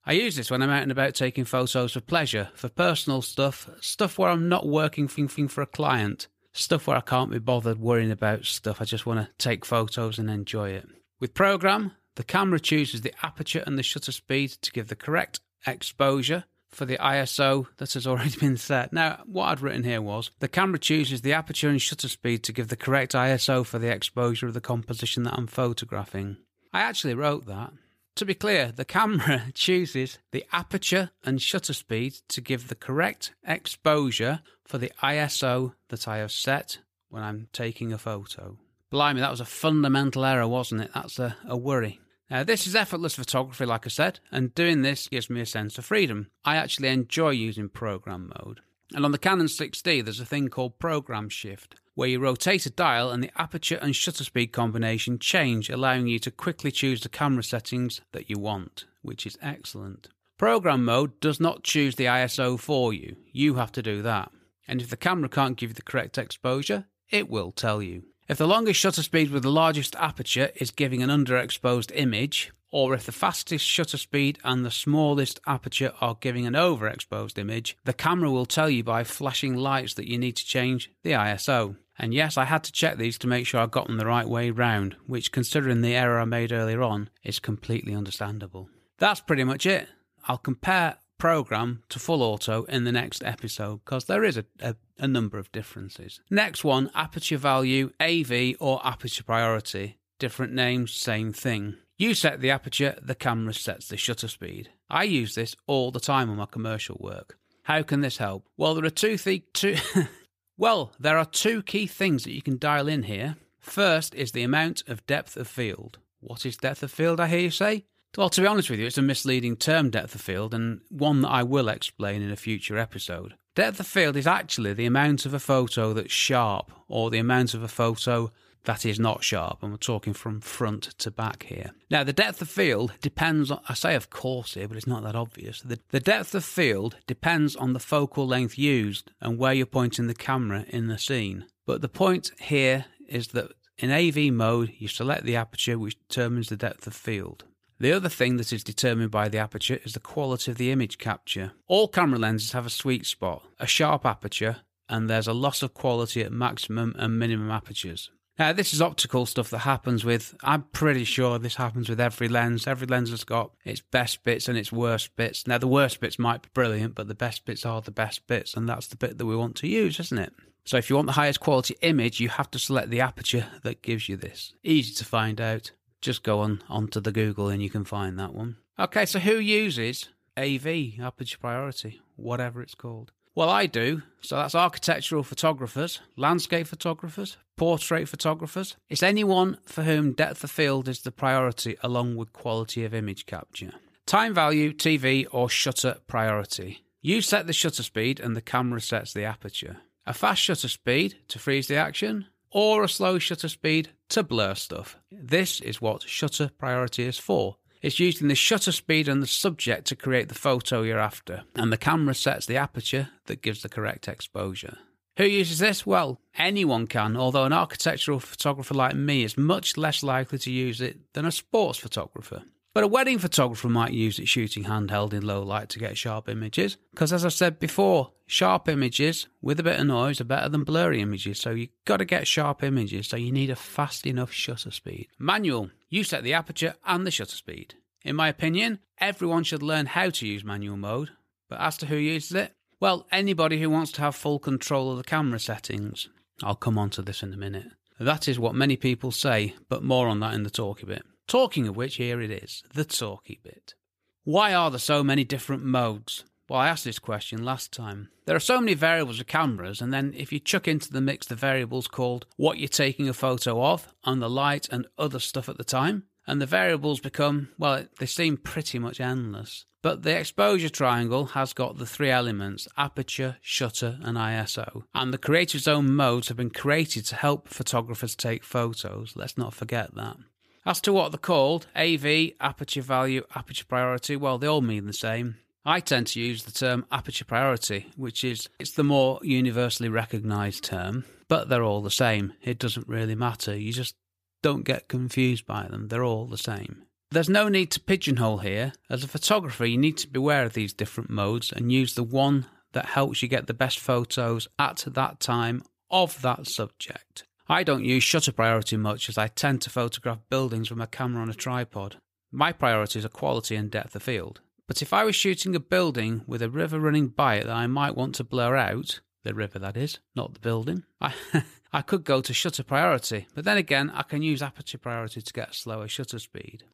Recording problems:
audio stuttering; at 5 s

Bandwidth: 15 kHz